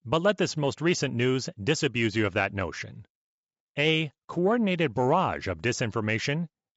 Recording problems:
high frequencies cut off; noticeable; nothing above 8 kHz

